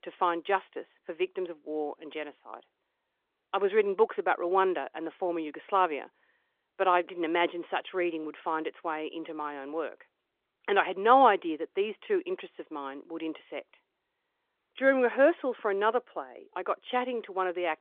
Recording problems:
phone-call audio; nothing above 3.5 kHz

